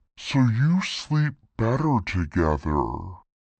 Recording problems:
wrong speed and pitch; too slow and too low; 0.6 times normal speed
muffled; slightly; fading above 3.5 kHz

